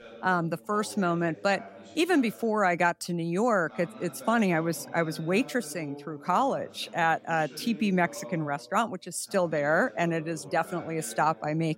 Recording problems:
voice in the background; noticeable; throughout; 20 dB below the speech

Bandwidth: 16 kHz